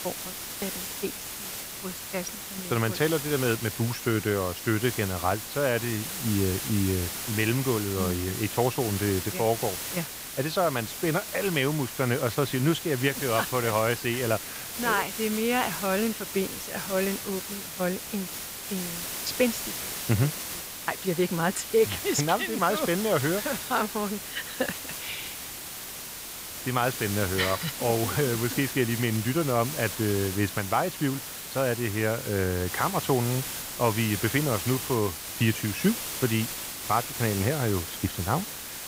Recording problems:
hiss; loud; throughout; 5 dB below the speech

